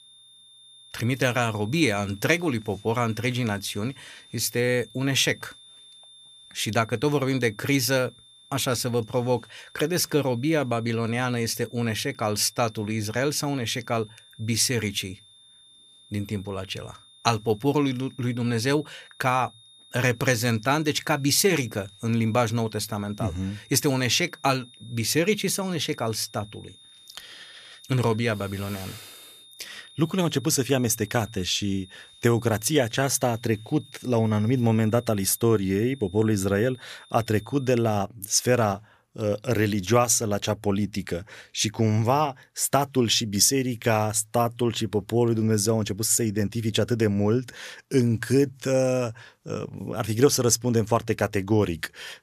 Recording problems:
high-pitched whine; faint; until 38 s; 3.5 kHz, 25 dB below the speech

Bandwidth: 14.5 kHz